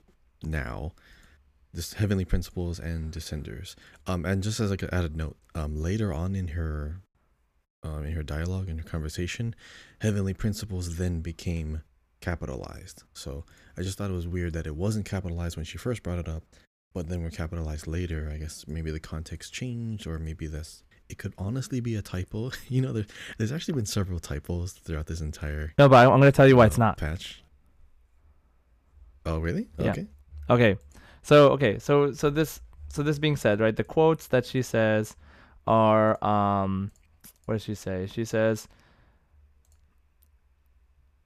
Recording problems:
none

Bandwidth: 14.5 kHz